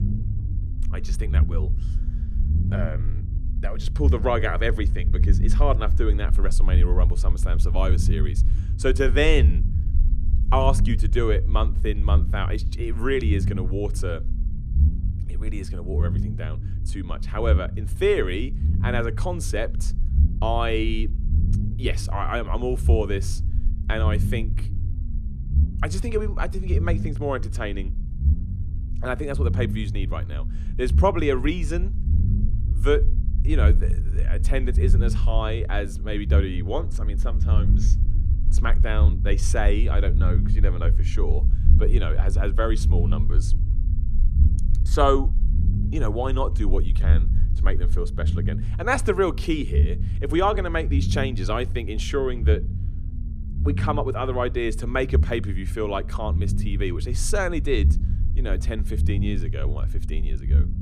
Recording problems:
low rumble; noticeable; throughout; 15 dB below the speech

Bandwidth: 14.5 kHz